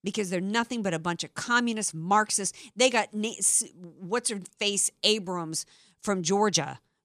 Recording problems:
none

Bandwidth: 14 kHz